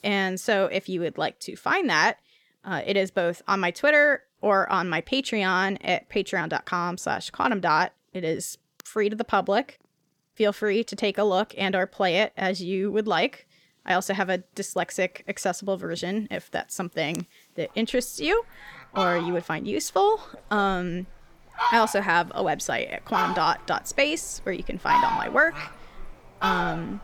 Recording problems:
animal sounds; loud; throughout; 3 dB below the speech

